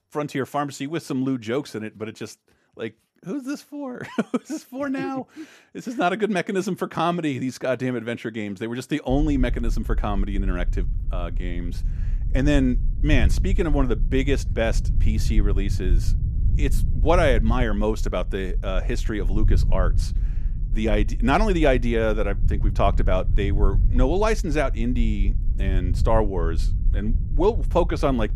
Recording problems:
low rumble; noticeable; from 9 s on; 20 dB below the speech

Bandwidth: 14.5 kHz